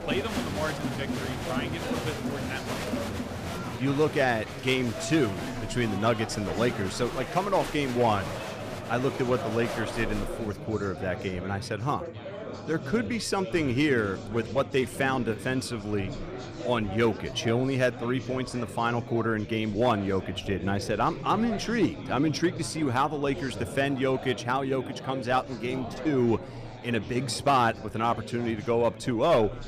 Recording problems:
murmuring crowd; loud; throughout; 8 dB below the speech

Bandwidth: 15 kHz